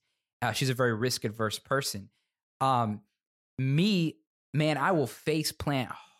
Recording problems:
none

